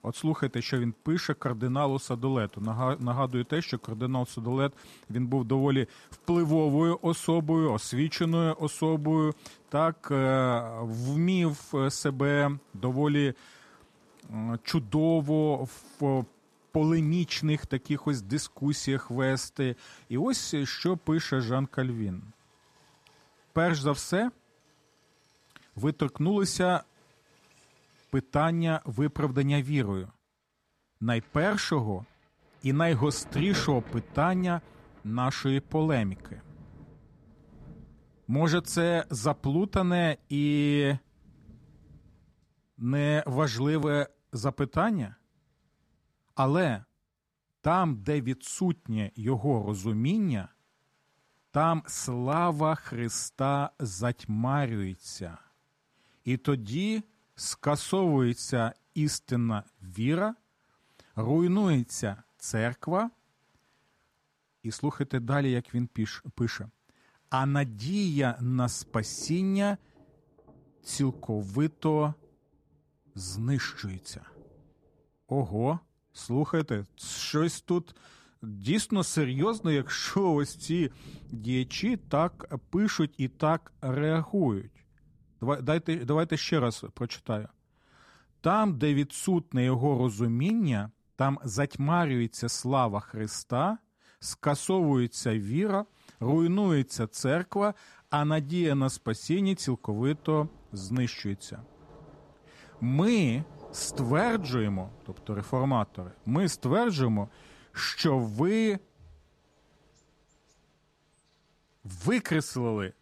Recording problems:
rain or running water; faint; throughout; 25 dB below the speech

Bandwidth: 14 kHz